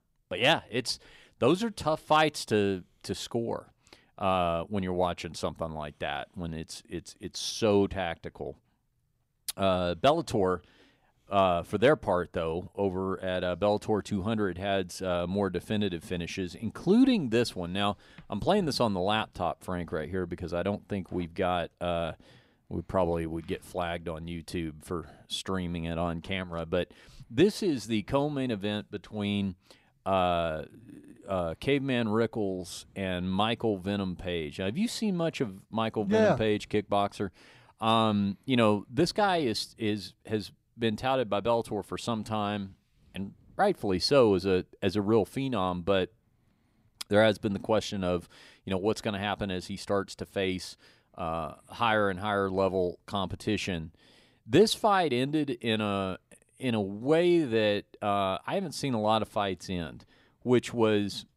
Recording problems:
none

